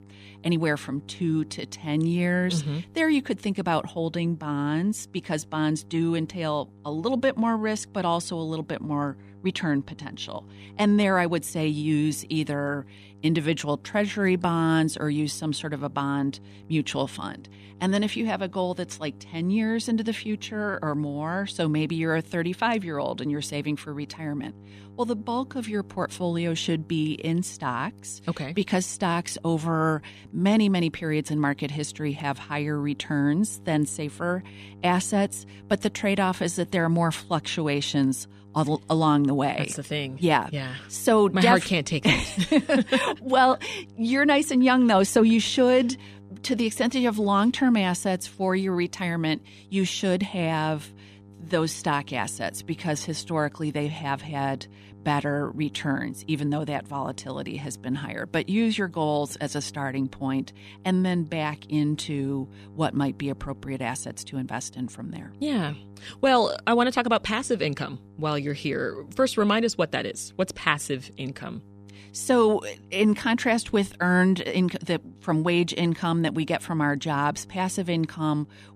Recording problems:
electrical hum; faint; throughout; 50 Hz, 30 dB below the speech

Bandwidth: 14.5 kHz